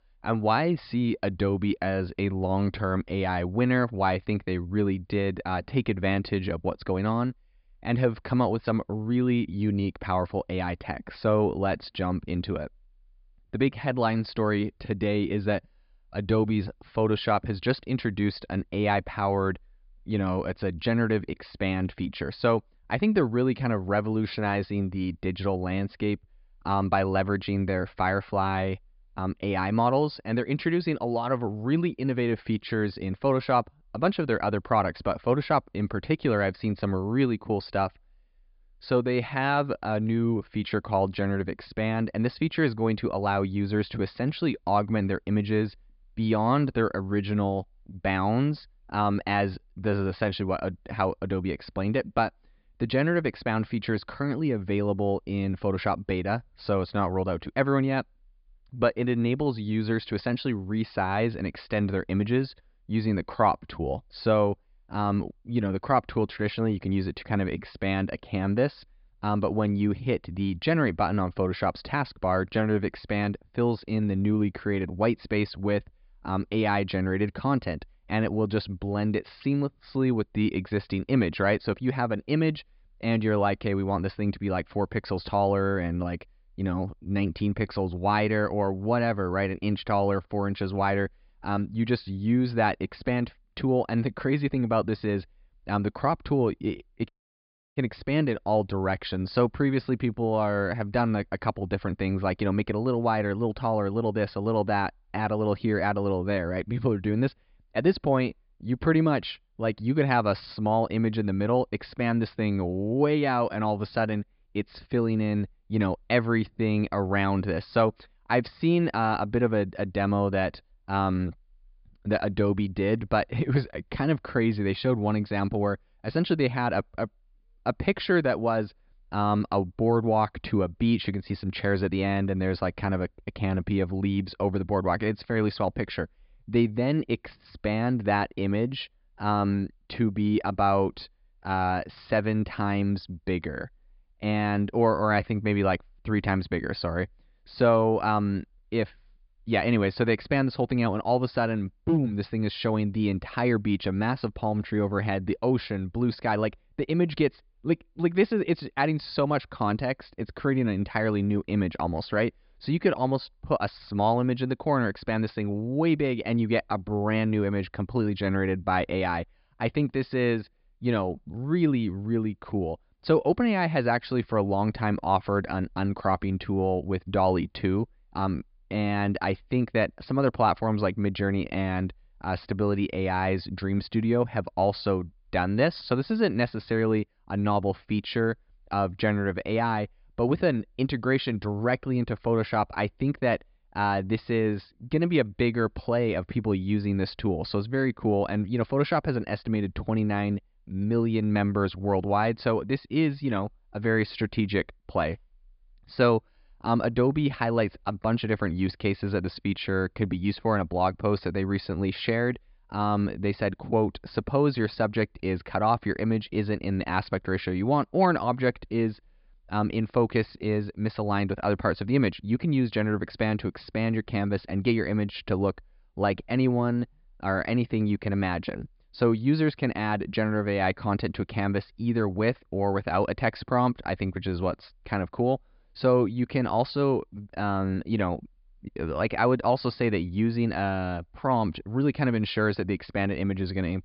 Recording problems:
high frequencies cut off; severe; nothing above 5 kHz
audio cutting out; at 1:37 for 0.5 s

